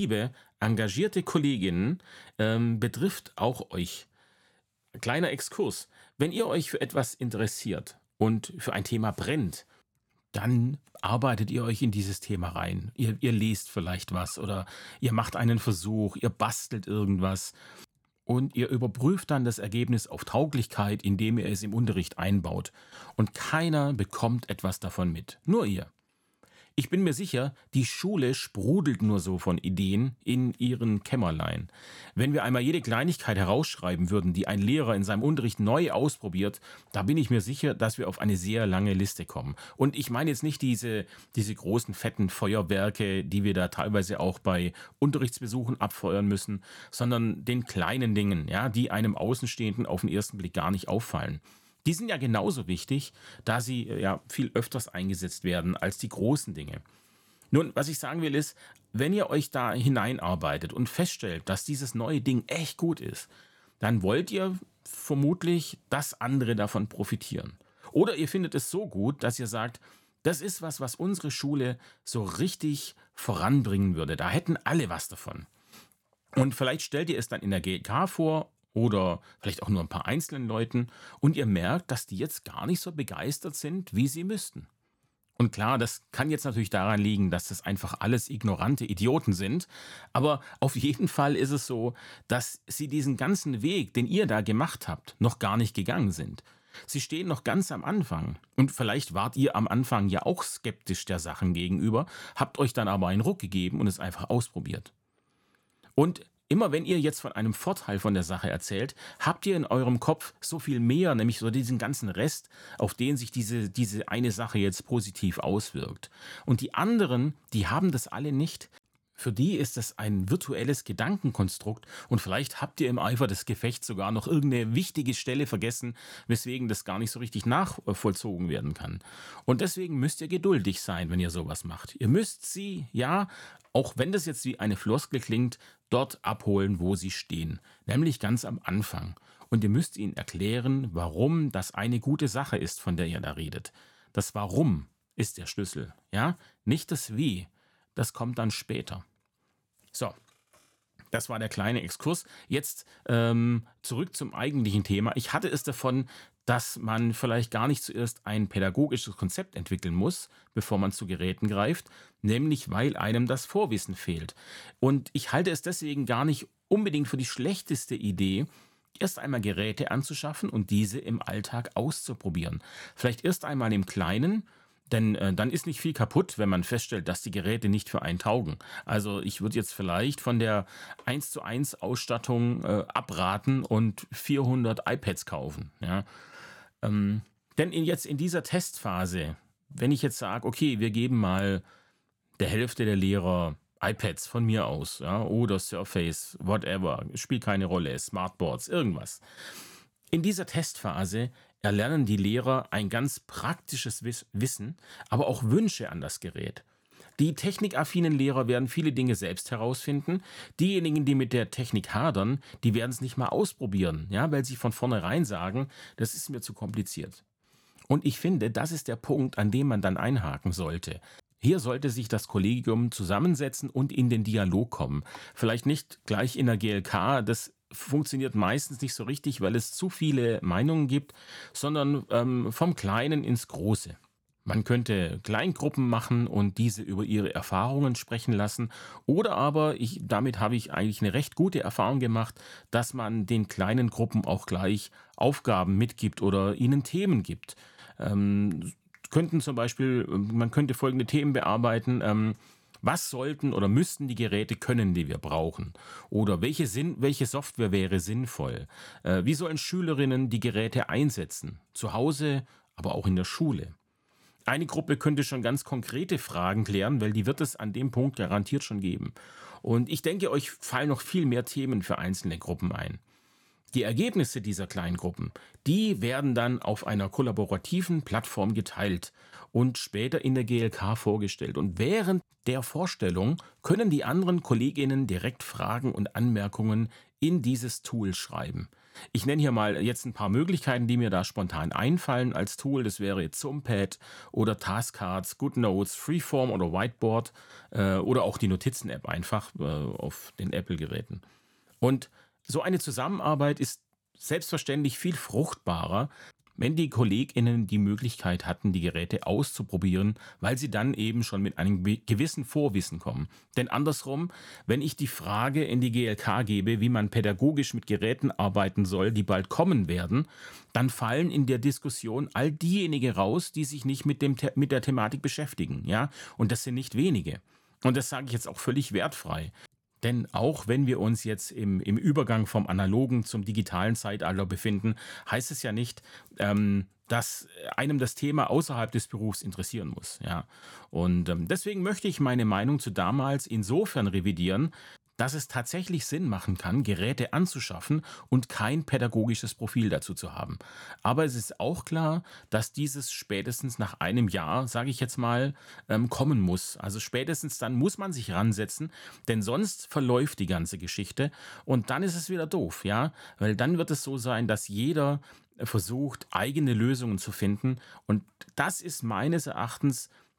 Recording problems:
abrupt cut into speech; at the start

